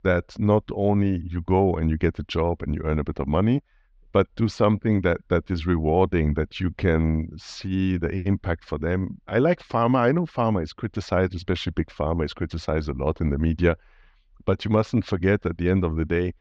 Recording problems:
muffled; slightly; fading above 4 kHz

